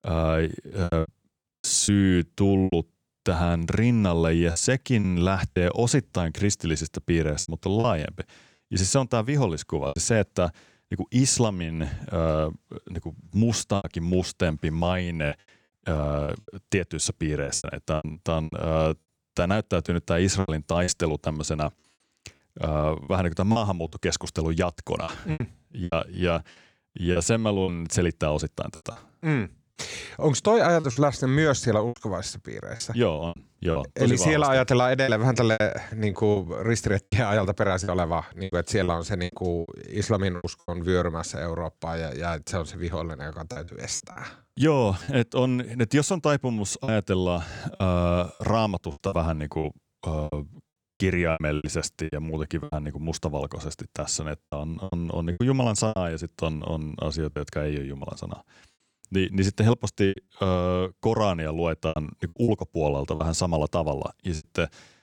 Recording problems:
choppy; very; 8% of the speech affected

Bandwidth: 19 kHz